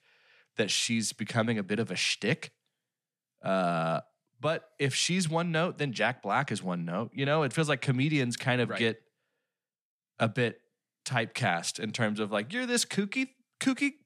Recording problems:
none

